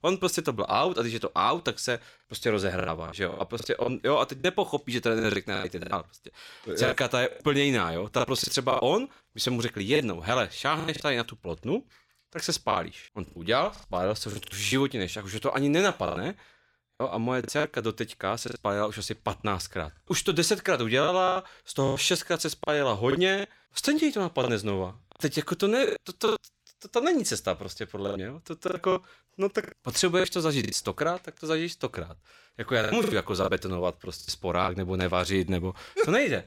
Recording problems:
choppy; very; 9% of the speech affected

